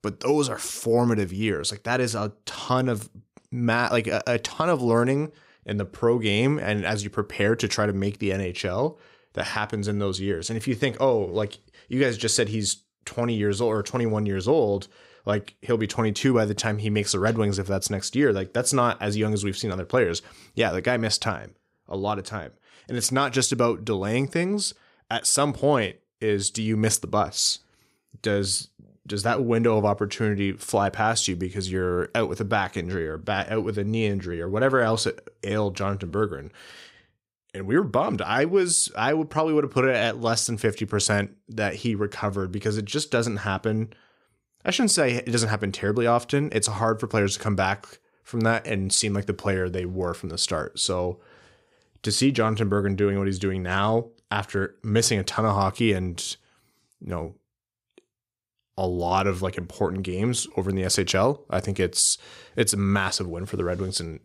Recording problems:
none

